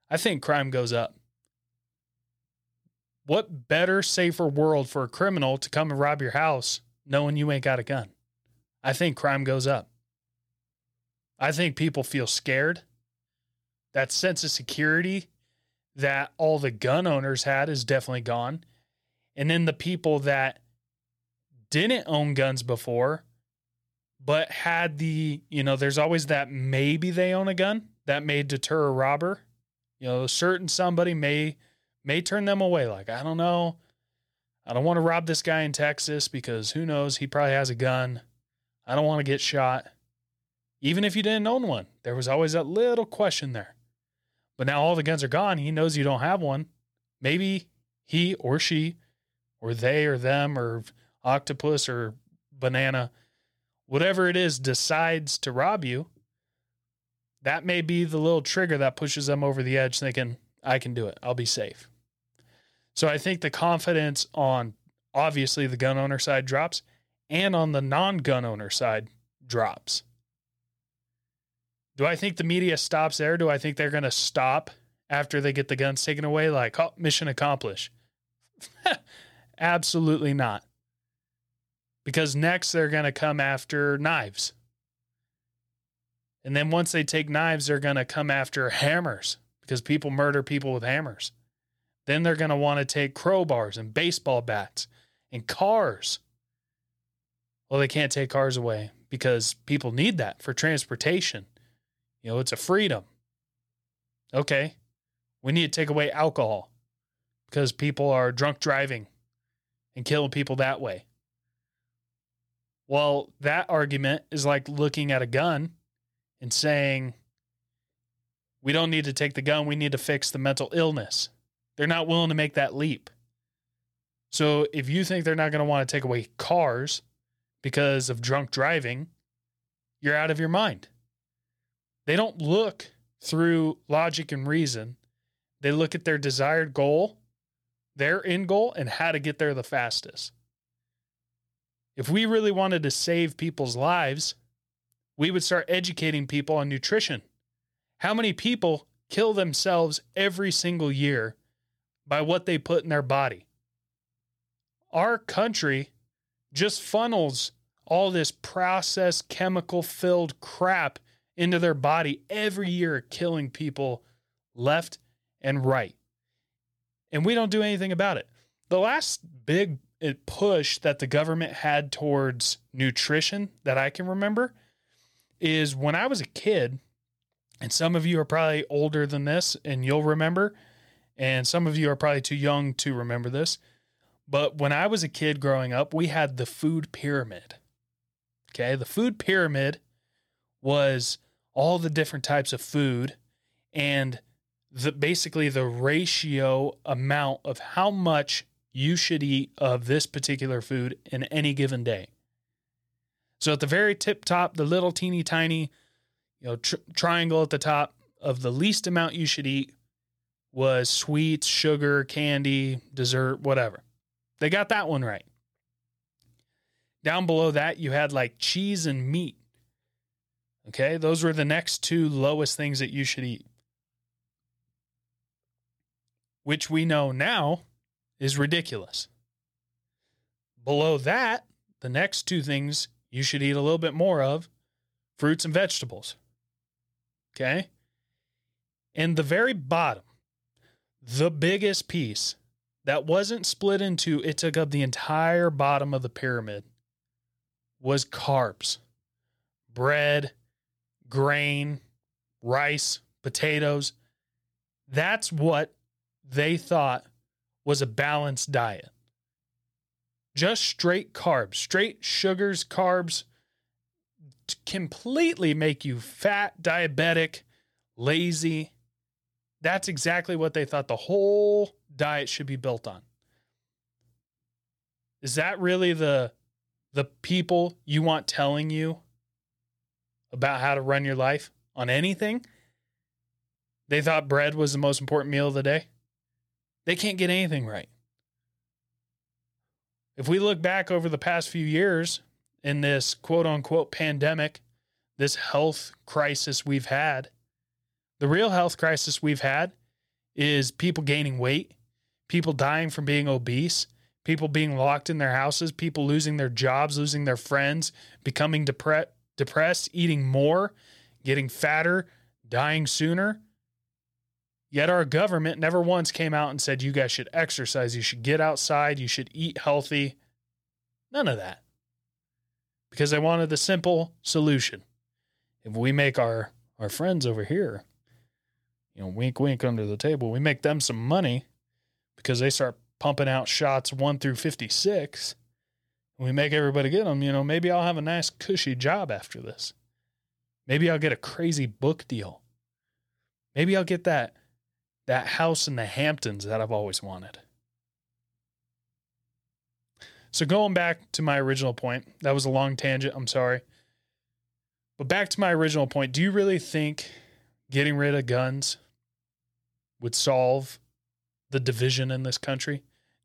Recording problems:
none

